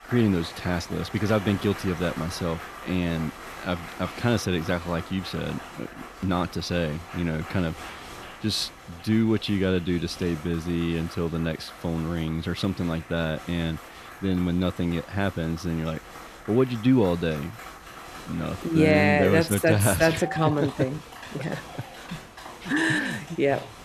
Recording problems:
crowd noise; noticeable; throughout; 15 dB below the speech

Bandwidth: 14.5 kHz